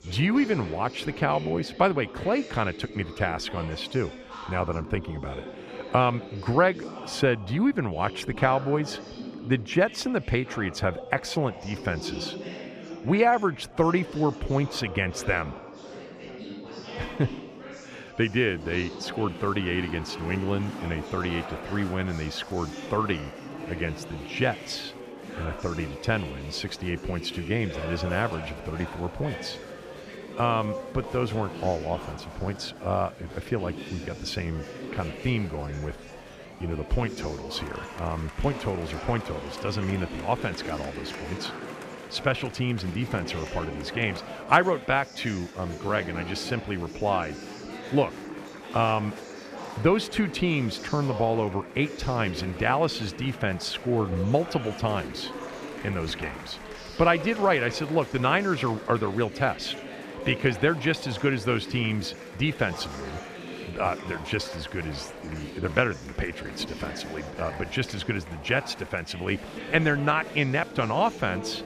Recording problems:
chatter from many people; noticeable; throughout; 10 dB below the speech

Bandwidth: 14.5 kHz